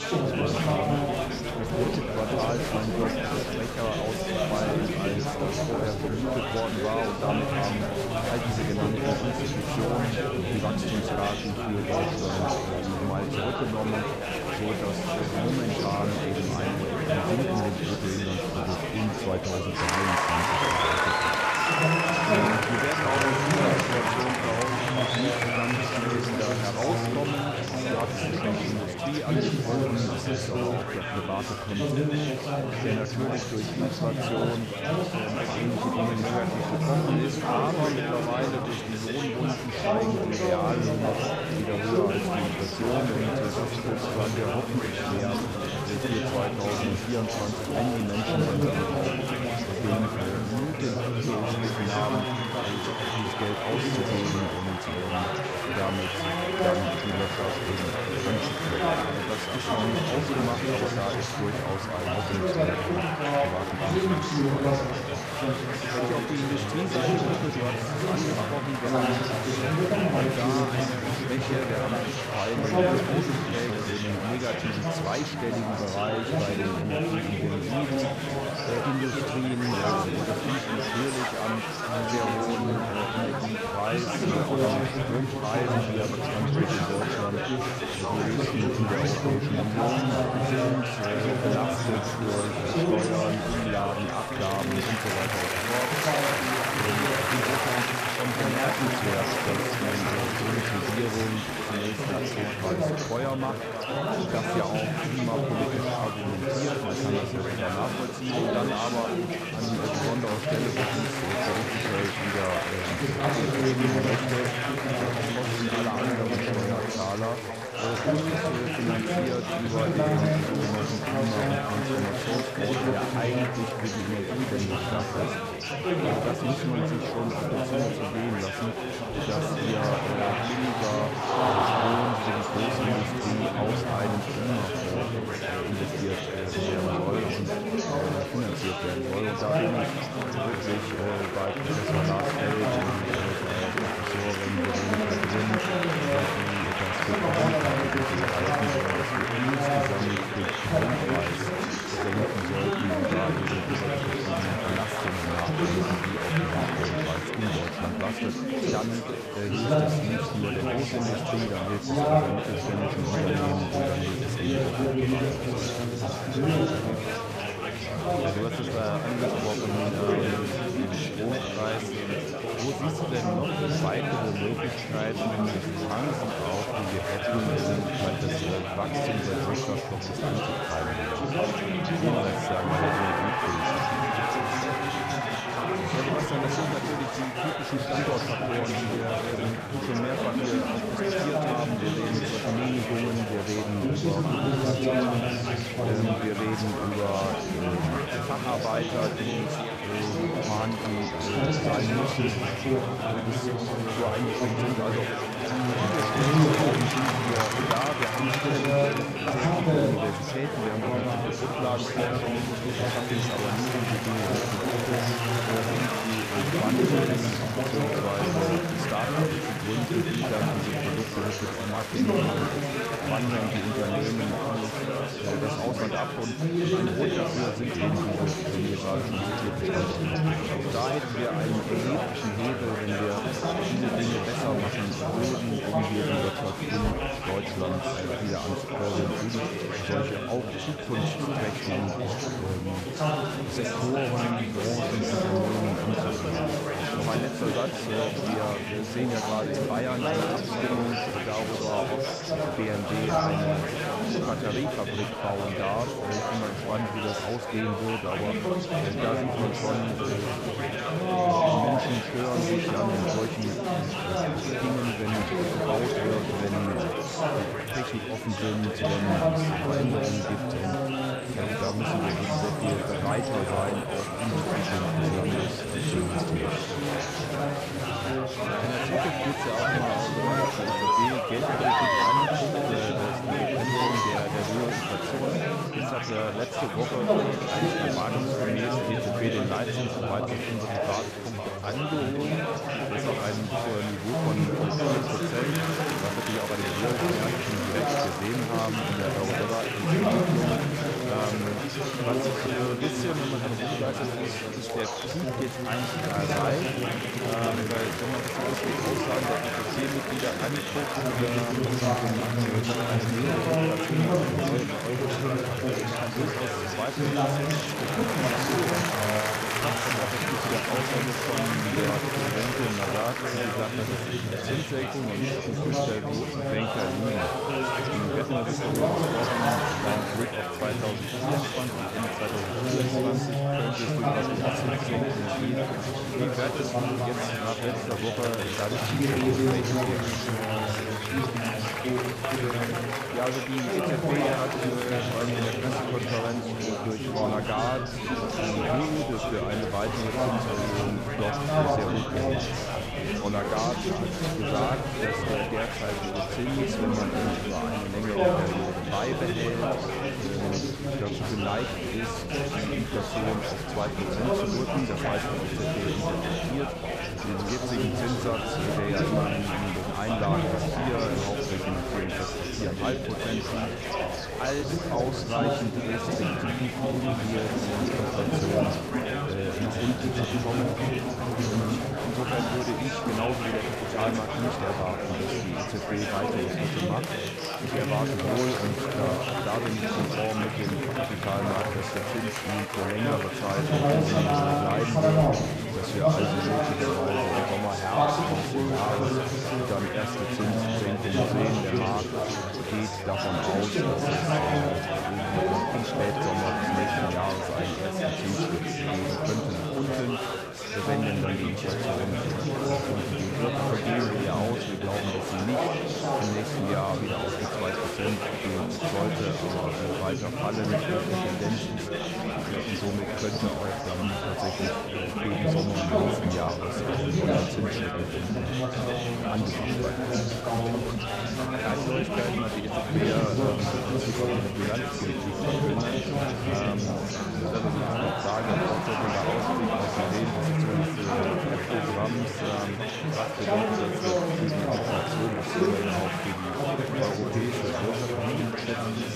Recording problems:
chatter from many people; very loud; throughout; 5 dB above the speech

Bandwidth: 14.5 kHz